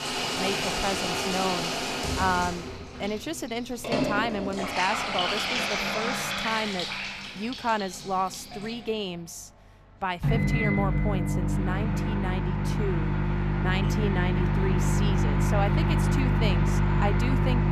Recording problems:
household noises; very loud; throughout; 5 dB above the speech

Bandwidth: 14.5 kHz